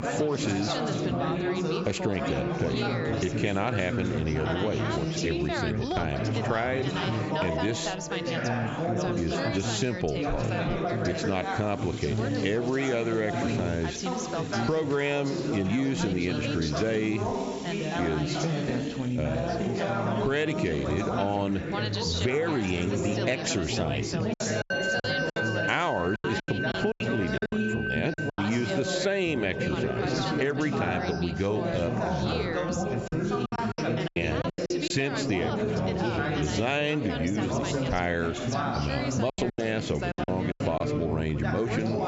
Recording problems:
high frequencies cut off; noticeable; nothing above 8 kHz
squashed, flat; somewhat
background music; loud; throughout; 9 dB below the speech
background chatter; loud; throughout; 4 voices, as loud as the speech
choppy; very; from 24 to 28 s, at 34 s and from 39 to 41 s; 14% of the speech affected

